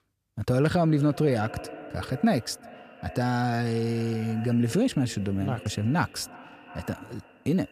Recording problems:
echo of what is said; noticeable; throughout; 350 ms later, 20 dB below the speech

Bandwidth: 14.5 kHz